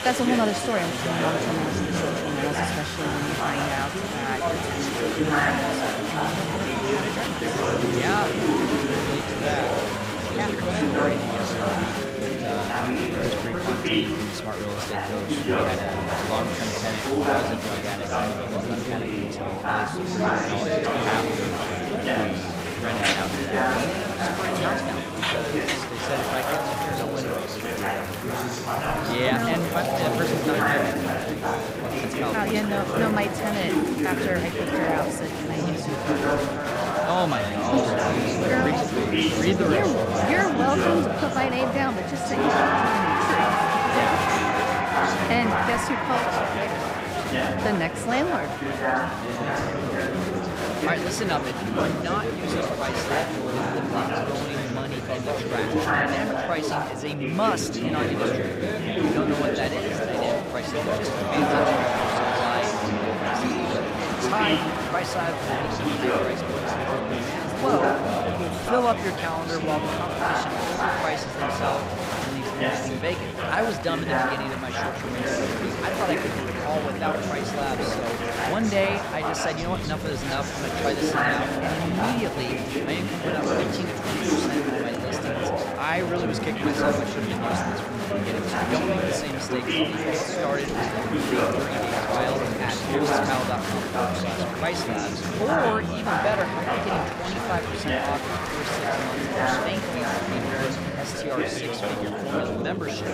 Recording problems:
chatter from many people; very loud; throughout; 5 dB above the speech

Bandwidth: 15.5 kHz